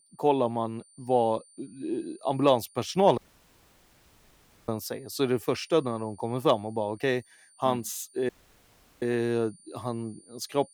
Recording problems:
high-pitched whine; faint; throughout; 9 kHz, 25 dB below the speech
audio cutting out; at 3 s for 1.5 s and at 8.5 s for 0.5 s

